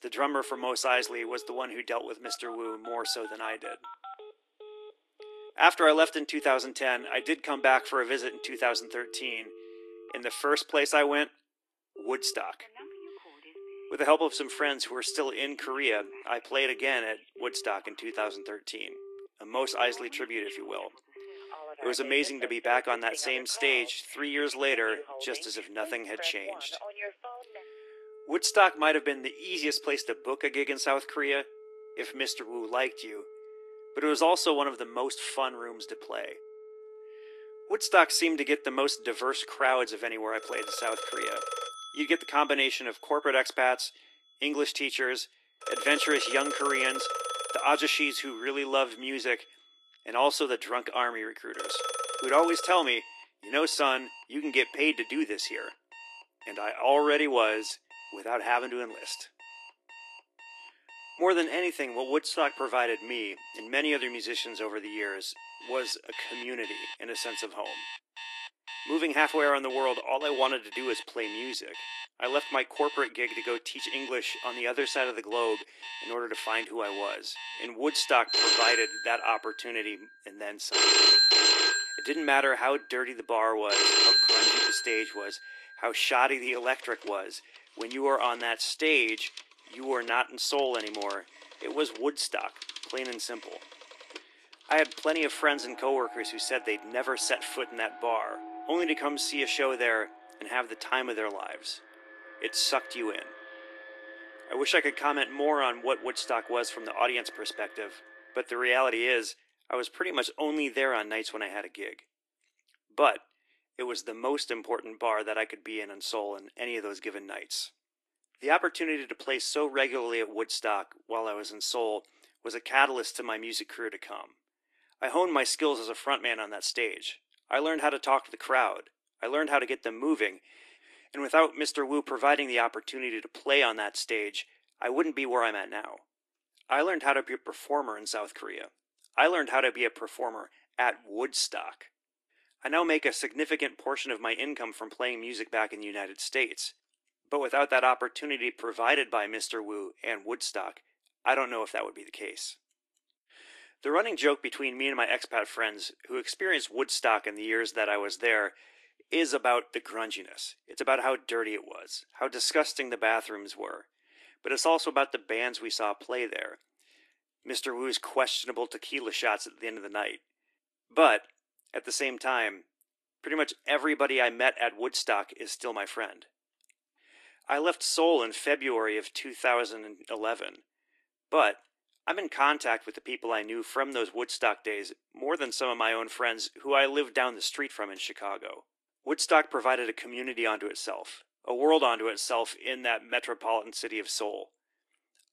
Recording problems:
thin; very; fading below 300 Hz
garbled, watery; slightly; nothing above 11.5 kHz
alarms or sirens; loud; until 1:48; 1 dB below the speech

